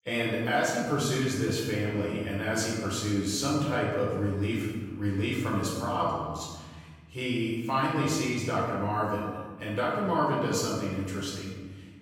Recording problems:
off-mic speech; far
room echo; noticeable; dies away in 1.5 s

